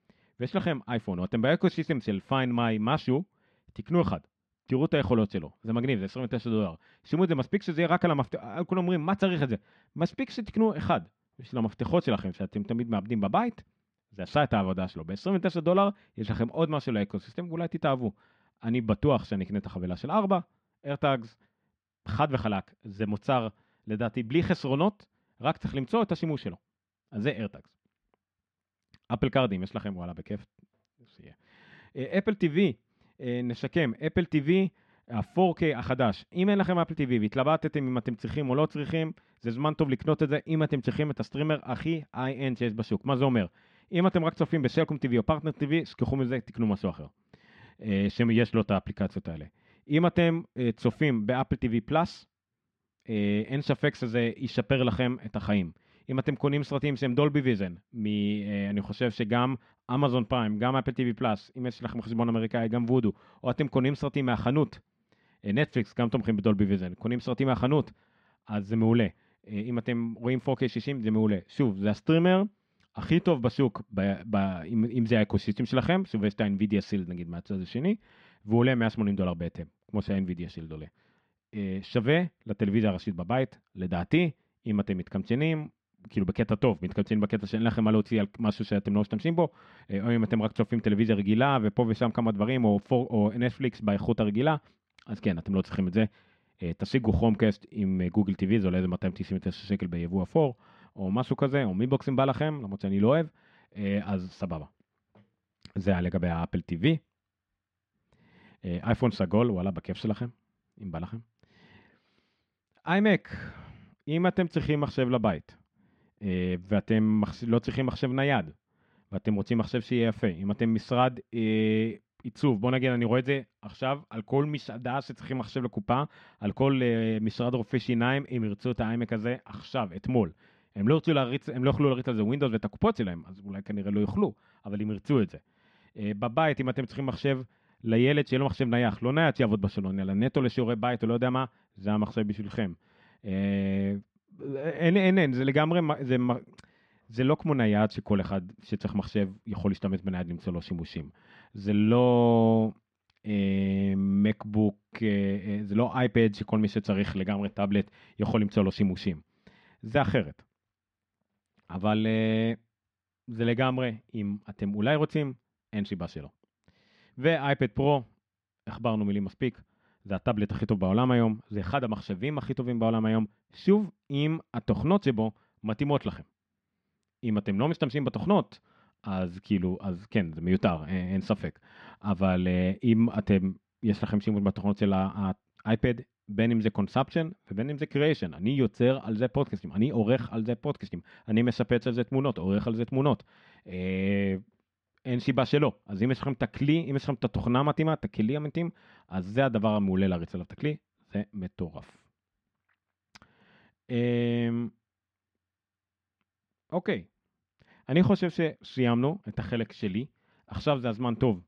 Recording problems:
muffled; slightly; fading above 2.5 kHz

